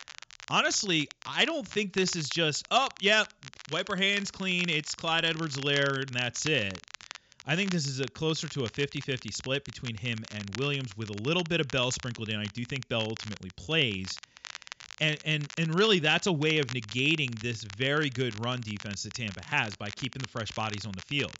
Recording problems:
high frequencies cut off; noticeable; nothing above 7.5 kHz
crackle, like an old record; noticeable; 15 dB below the speech

